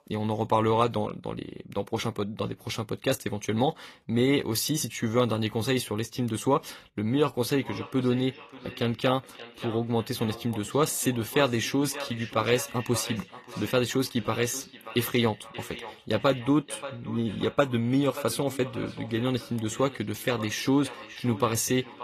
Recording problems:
echo of what is said; noticeable; from 7.5 s on; 580 ms later, 15 dB below the speech
garbled, watery; slightly; nothing above 14.5 kHz

